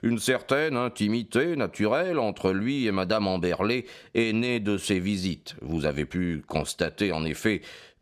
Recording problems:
none

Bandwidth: 15 kHz